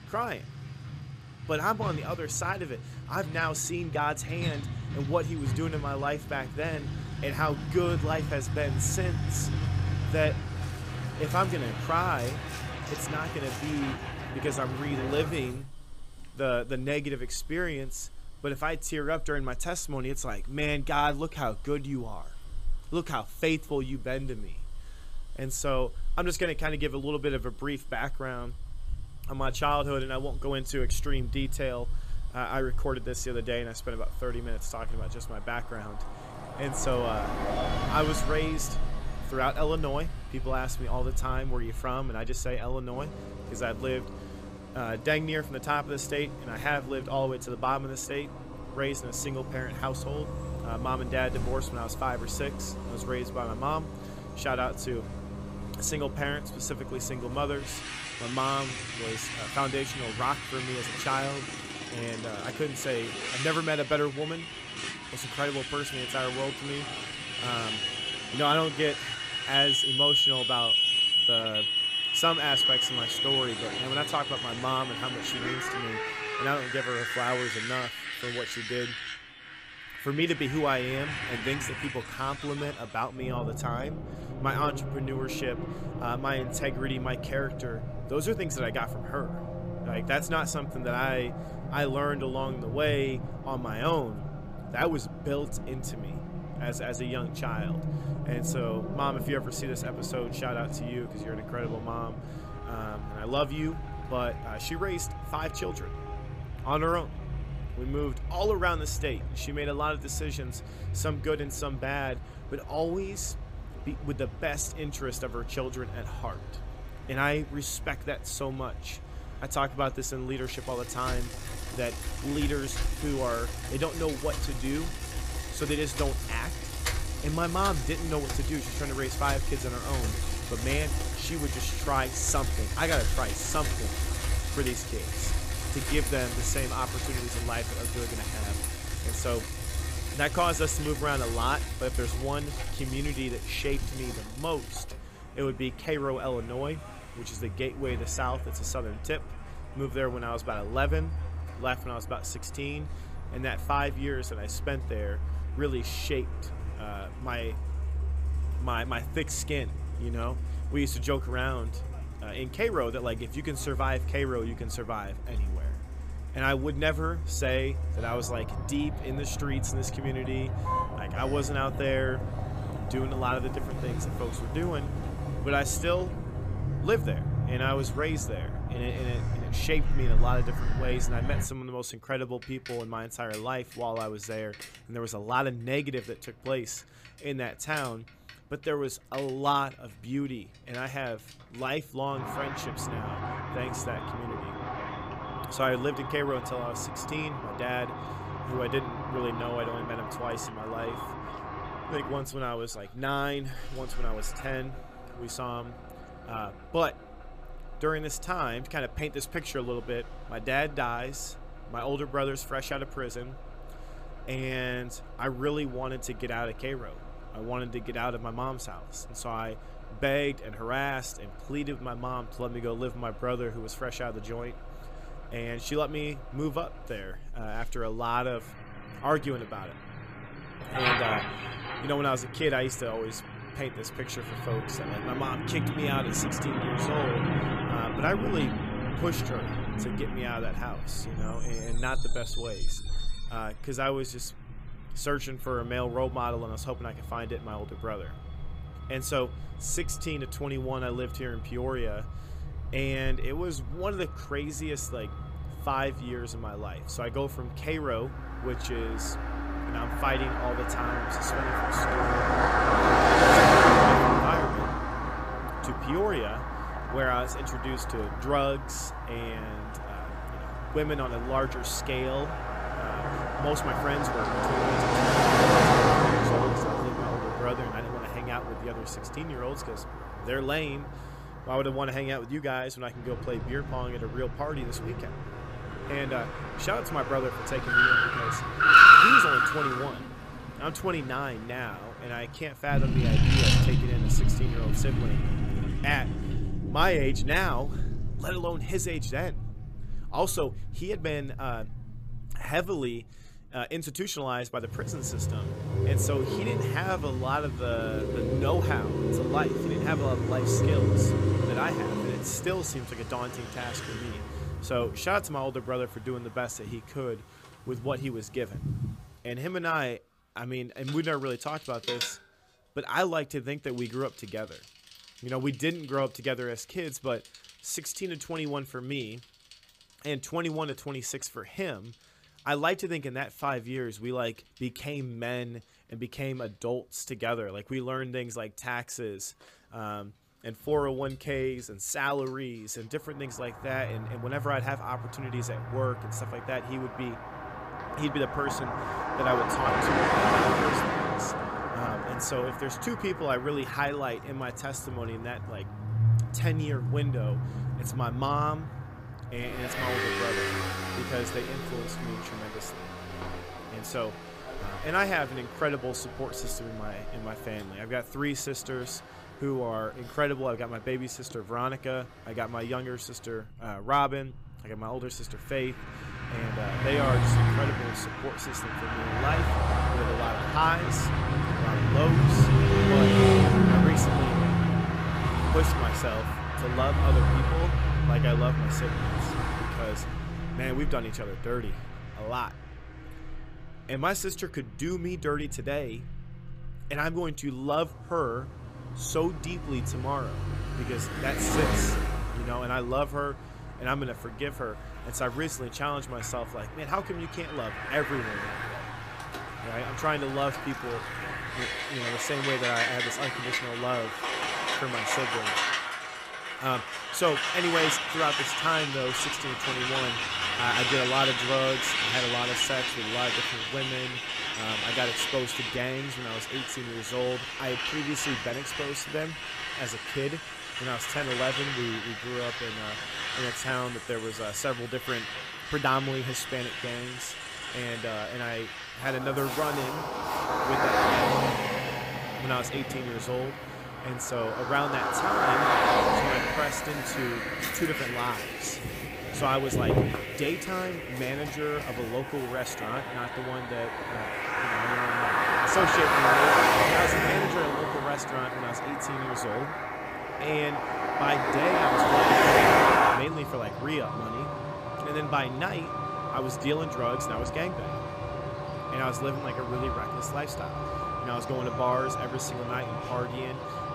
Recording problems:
traffic noise; very loud; throughout; 3 dB above the speech

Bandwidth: 15 kHz